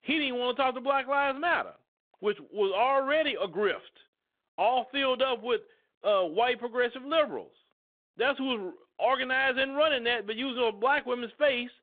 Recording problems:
phone-call audio

